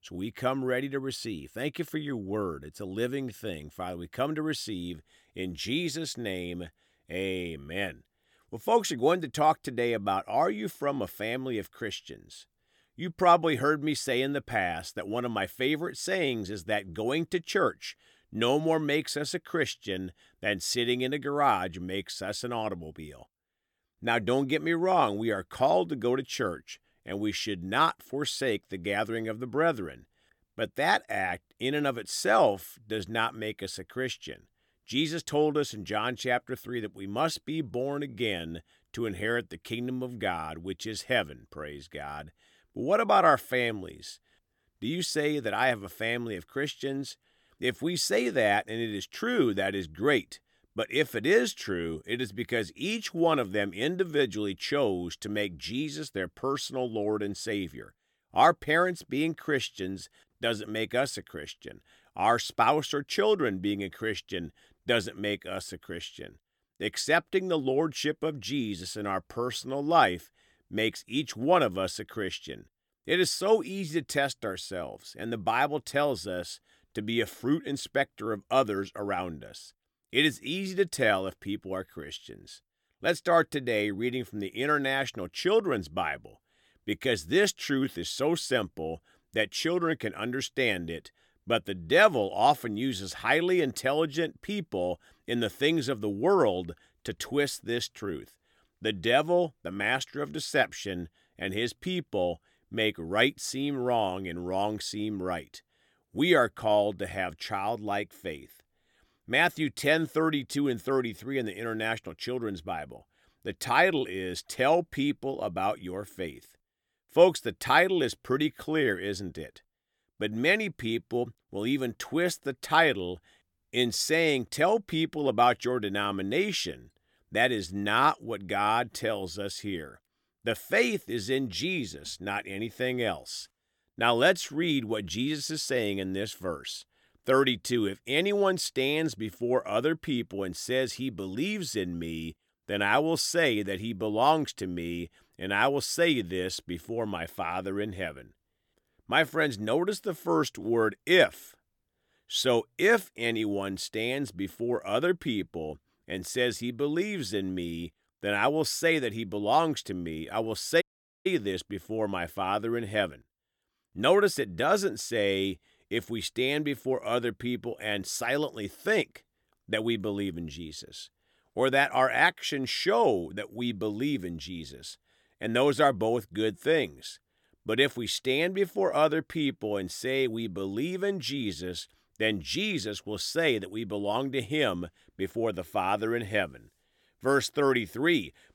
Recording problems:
audio cutting out; at 2:41

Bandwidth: 18 kHz